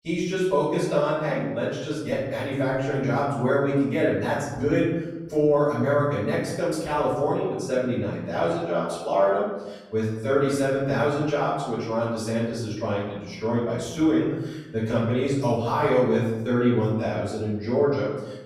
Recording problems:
off-mic speech; far
room echo; noticeable; dies away in 1 s

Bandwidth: 16 kHz